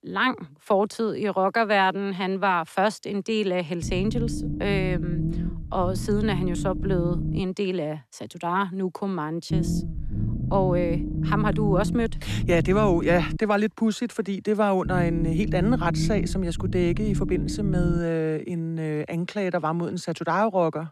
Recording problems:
low rumble; noticeable; from 4 to 7.5 s, from 9.5 to 13 s and from 15 to 18 s; 10 dB below the speech

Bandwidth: 13.5 kHz